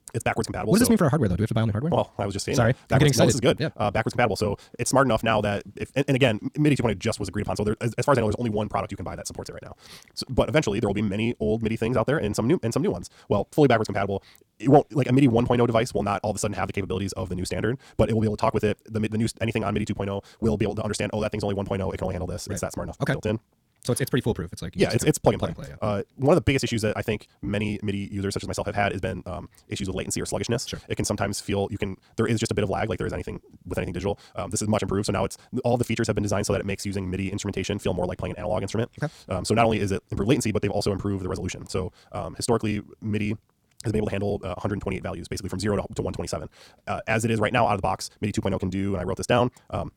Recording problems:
wrong speed, natural pitch; too fast; 1.7 times normal speed

